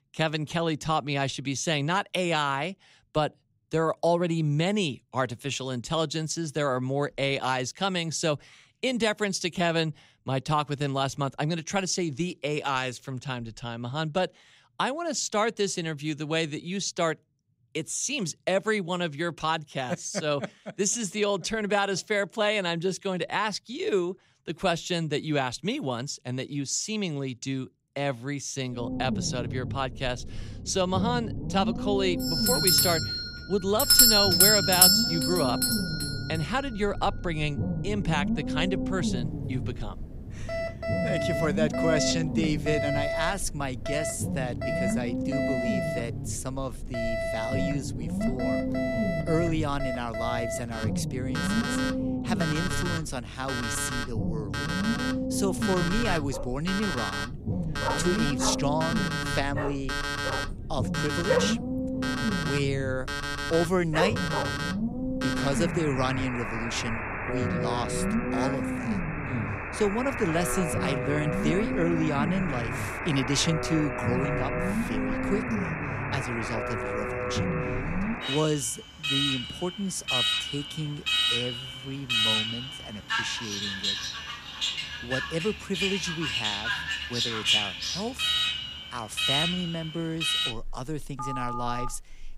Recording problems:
alarms or sirens; very loud; from 32 s on; 2 dB above the speech
low rumble; loud; from 29 s to 1:18; 8 dB below the speech
dog barking; loud; from 56 s to 1:04; peak 3 dB above the speech

